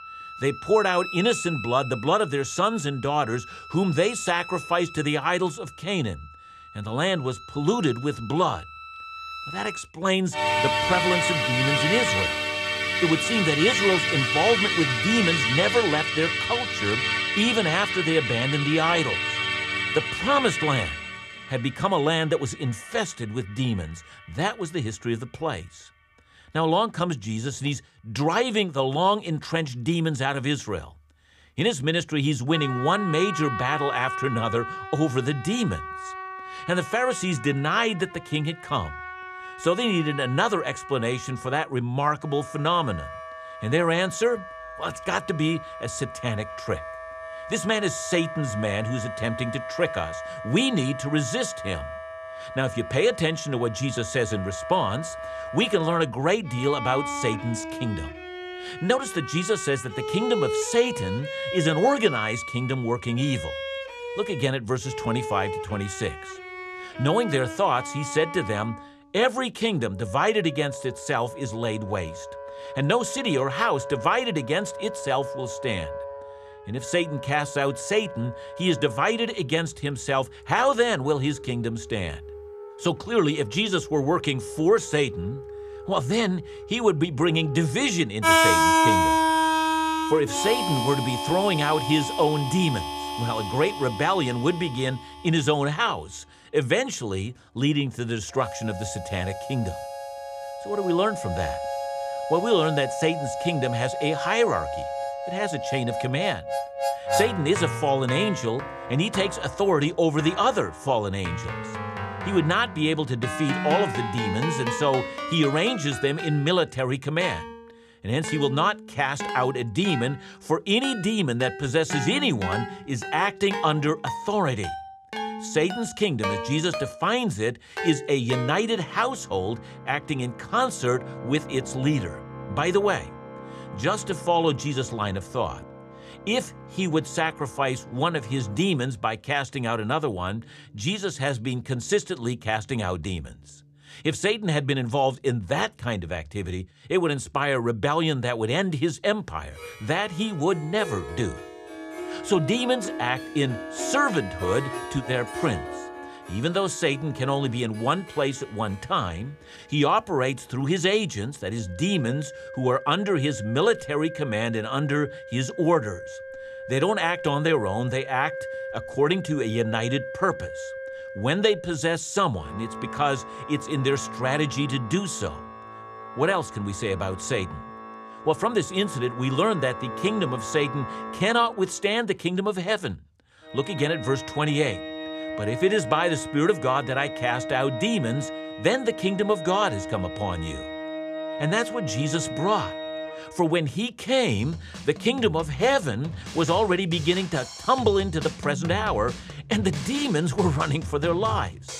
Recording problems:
background music; loud; throughout; 5 dB below the speech

